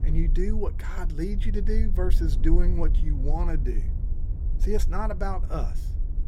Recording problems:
low rumble; noticeable; throughout; 15 dB below the speech

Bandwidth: 16.5 kHz